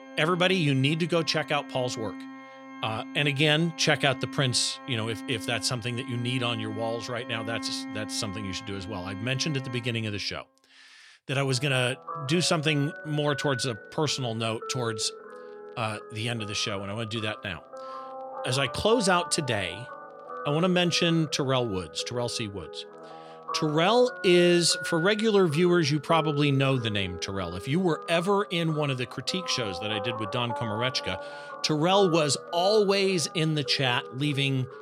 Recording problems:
background music; noticeable; throughout; 15 dB below the speech

